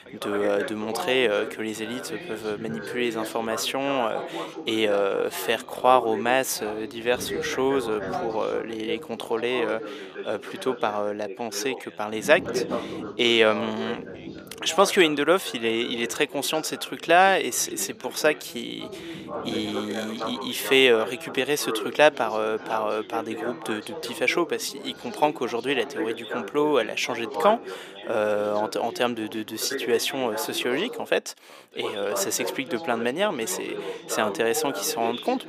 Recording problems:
thin; somewhat; fading below 450 Hz
background chatter; loud; throughout; 3 voices, 10 dB below the speech

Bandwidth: 15 kHz